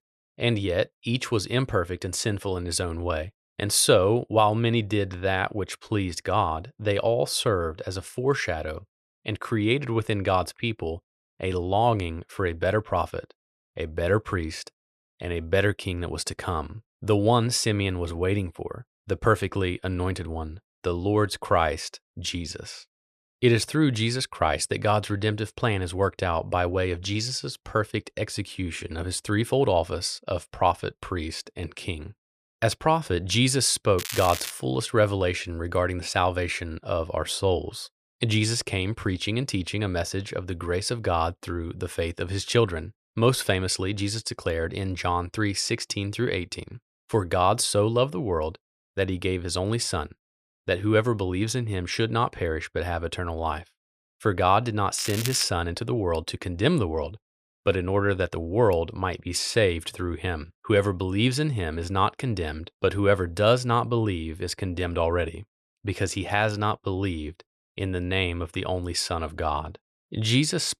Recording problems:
crackling; loud; at 34 s and at 55 s; 7 dB below the speech

